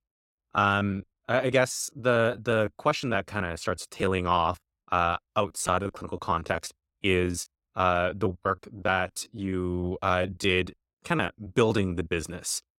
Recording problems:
choppy; very; 16% of the speech affected

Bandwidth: 16.5 kHz